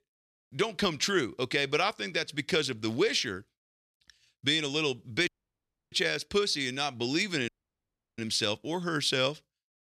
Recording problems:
audio cutting out; at 5.5 s for 0.5 s and at 7.5 s for 0.5 s

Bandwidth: 13.5 kHz